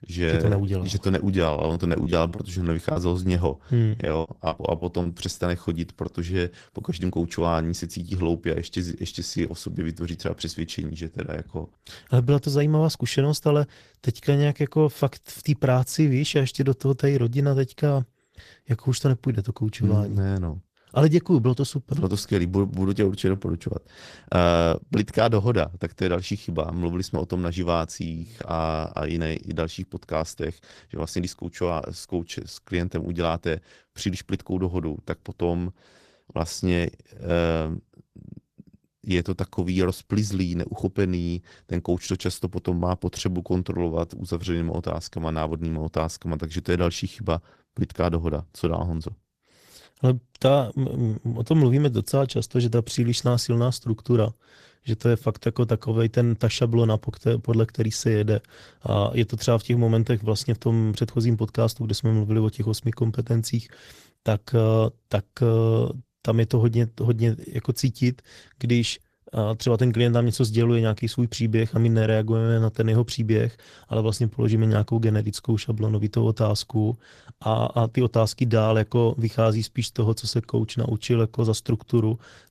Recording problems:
garbled, watery; slightly; nothing above 14.5 kHz
choppy; very; from 1.5 to 5 s; 10% of the speech affected

